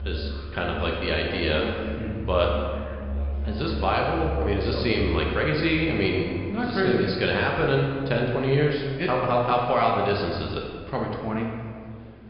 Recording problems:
high frequencies cut off; severe; nothing above 5 kHz
room echo; noticeable; dies away in 1.6 s
off-mic speech; somewhat distant
background music; loud; throughout; 8 dB below the speech
murmuring crowd; faint; throughout; 30 dB below the speech

